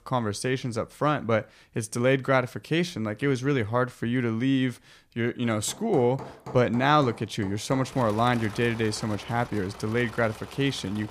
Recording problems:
machinery noise; noticeable; from 5.5 s on; 15 dB below the speech

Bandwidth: 14.5 kHz